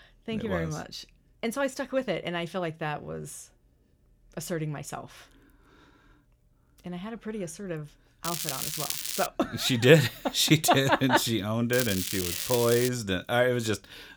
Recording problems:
crackling; loud; from 8.5 to 9.5 s and from 12 to 13 s; 4 dB below the speech

